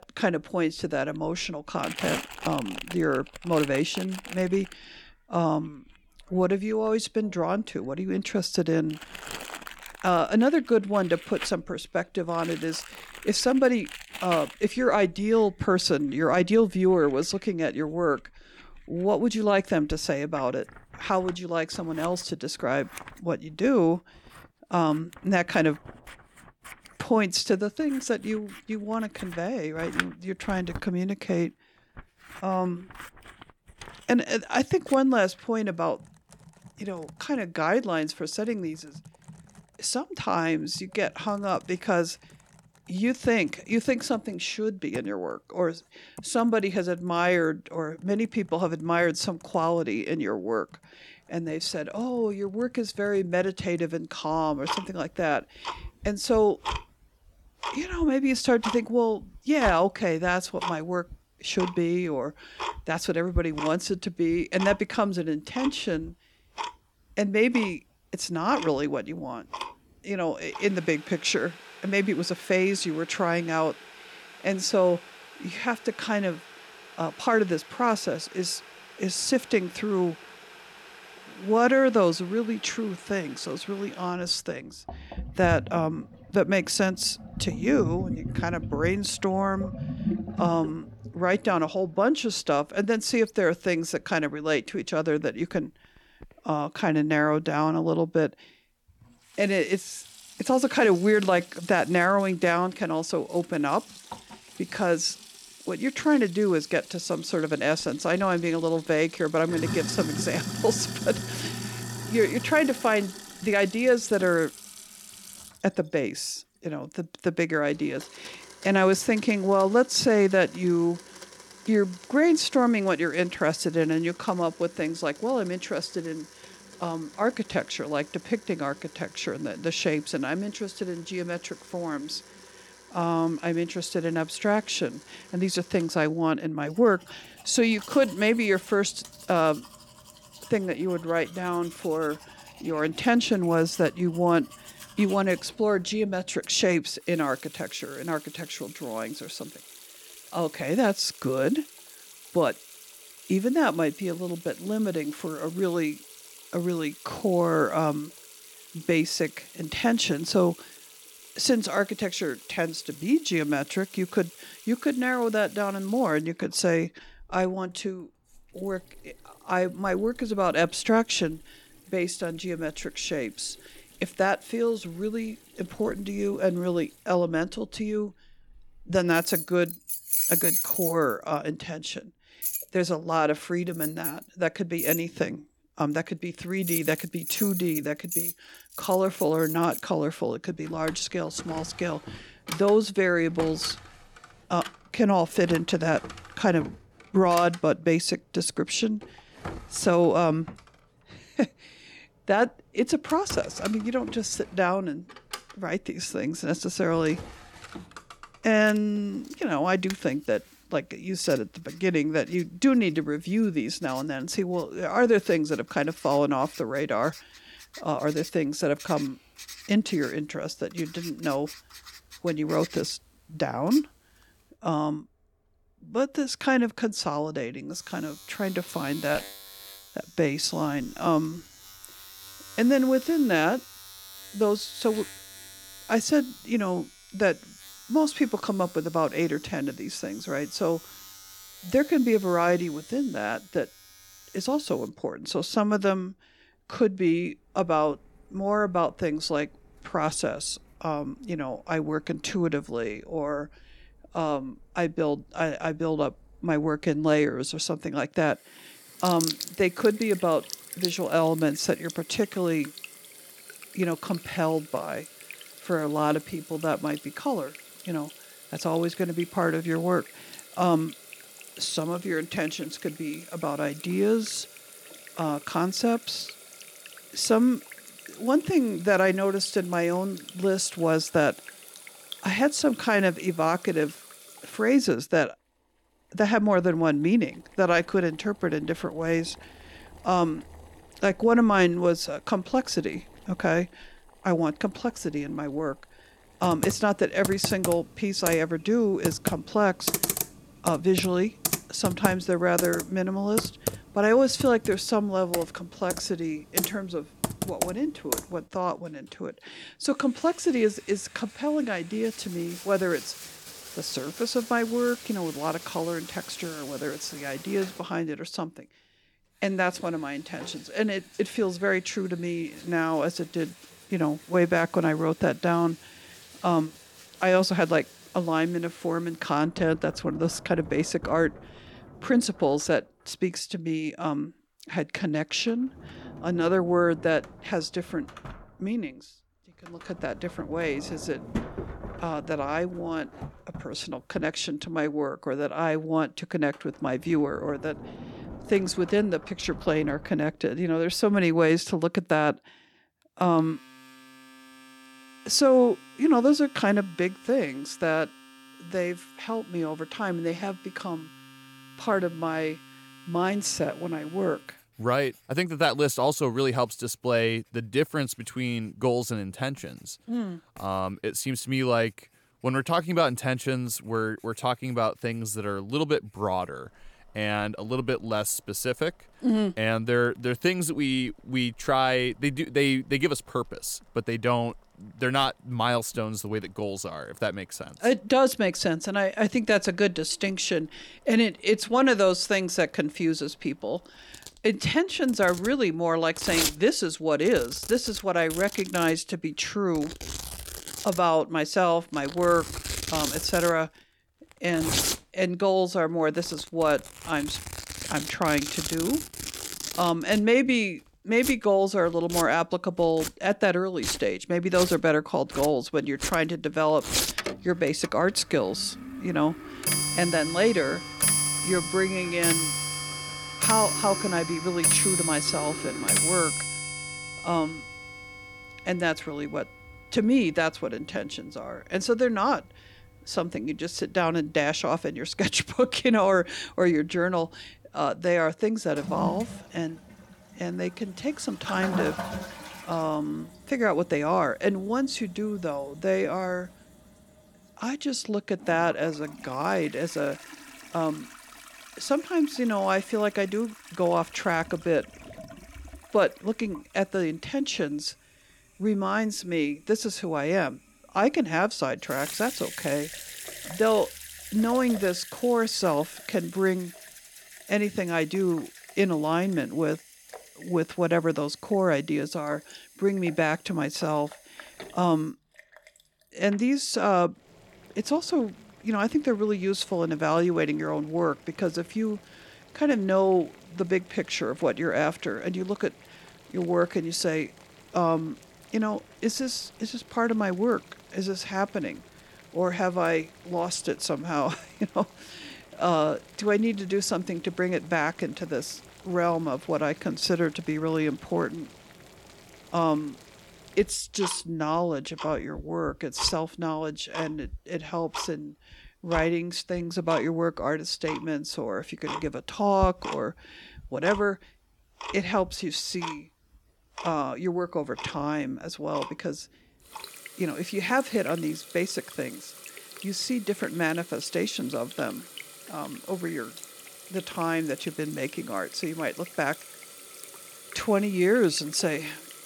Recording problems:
household noises; loud; throughout; 10 dB below the speech

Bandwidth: 17.5 kHz